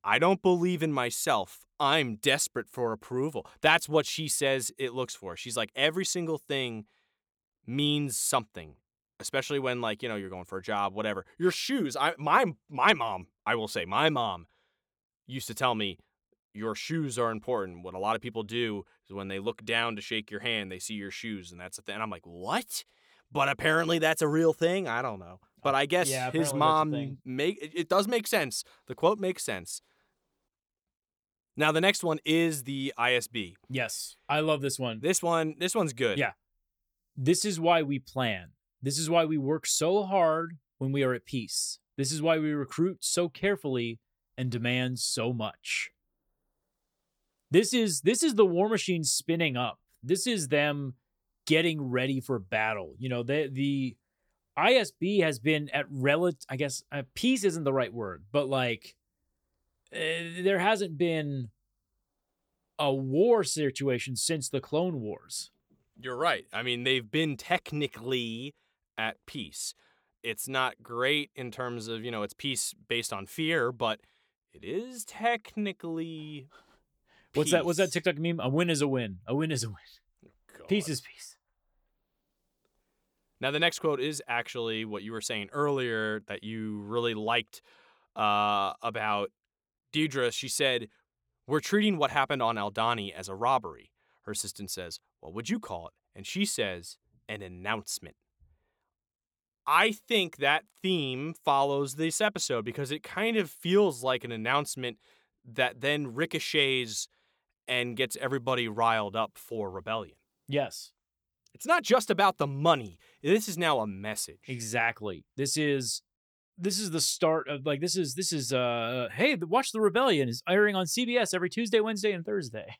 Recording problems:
none

